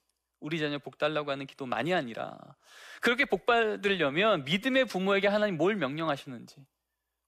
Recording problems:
none

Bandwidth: 15 kHz